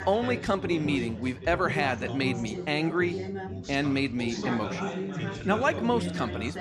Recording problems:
background chatter; loud; throughout; 4 voices, 6 dB below the speech

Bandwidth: 14 kHz